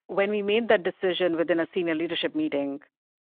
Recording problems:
phone-call audio

